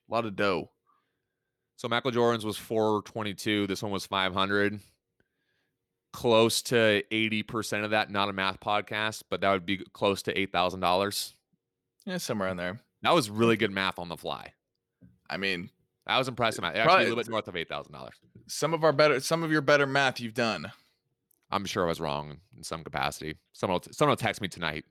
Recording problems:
none

